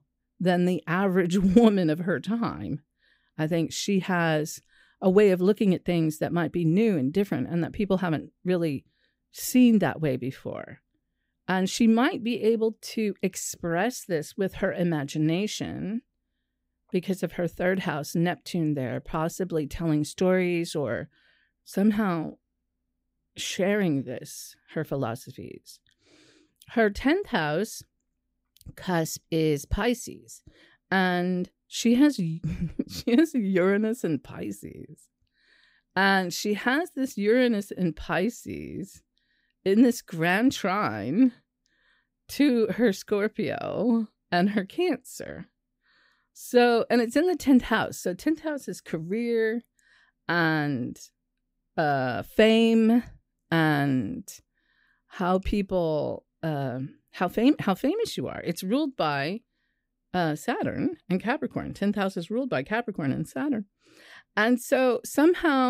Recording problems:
abrupt cut into speech; at the end

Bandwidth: 15.5 kHz